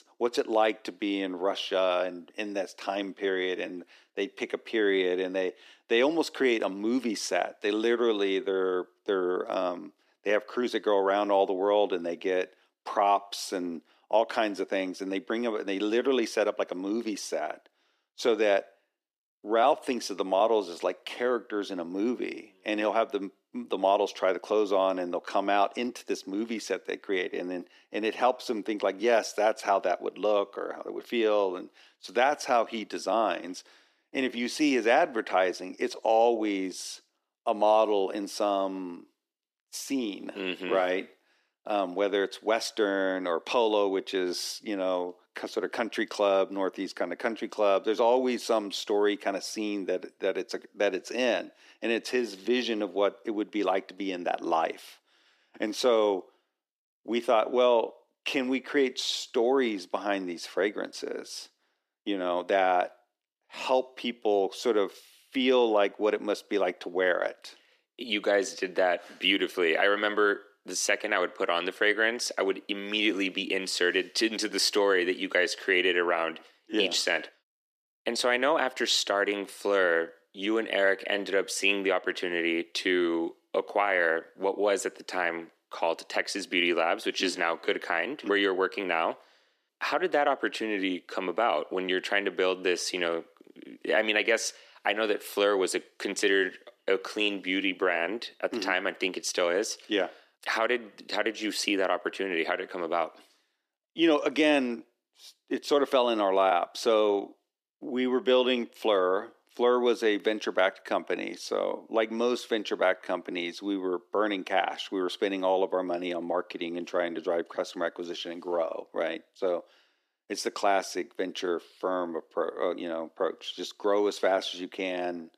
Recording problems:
thin; somewhat; fading below 300 Hz

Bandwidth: 14.5 kHz